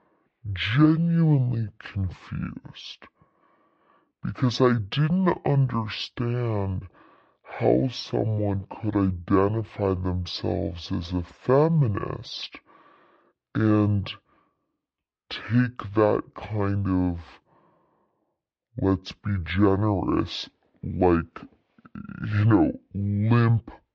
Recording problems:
wrong speed and pitch; too slow and too low; 0.6 times normal speed
muffled; slightly; fading above 3 kHz

